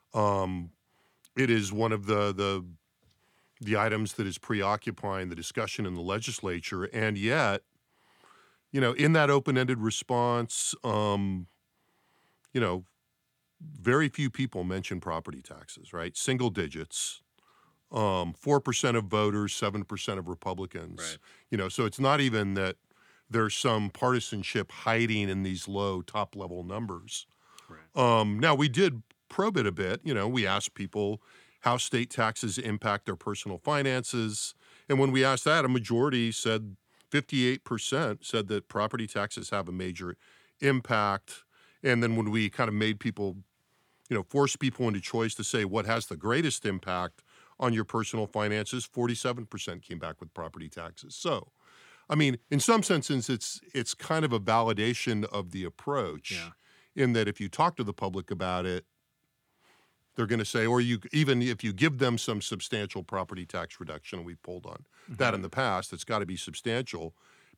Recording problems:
none

